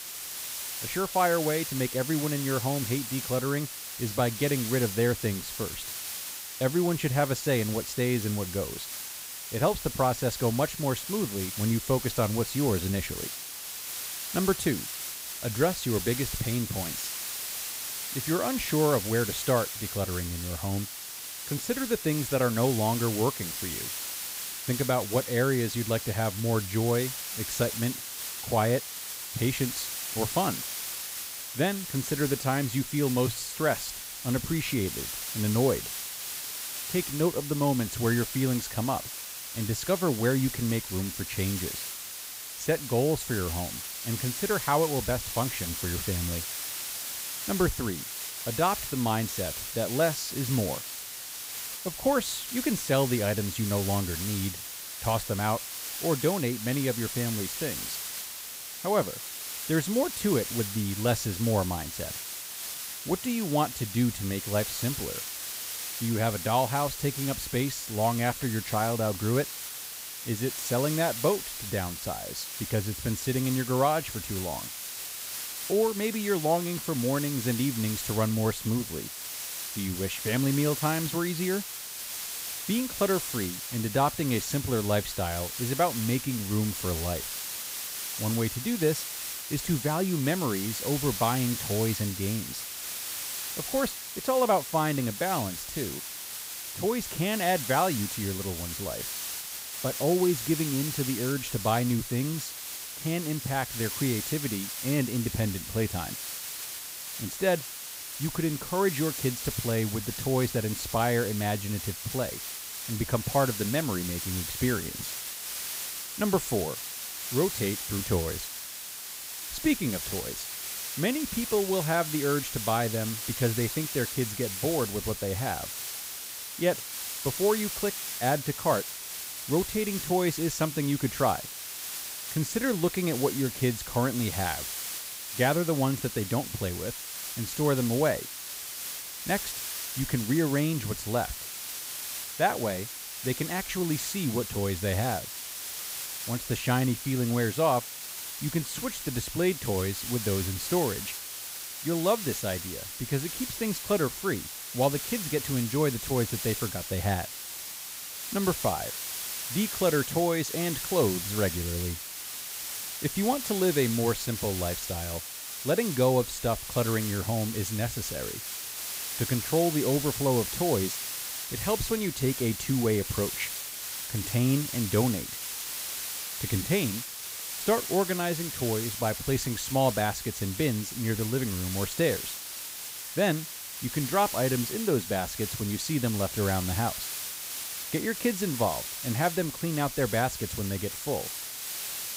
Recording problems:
hiss; loud; throughout; 5 dB below the speech

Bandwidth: 15.5 kHz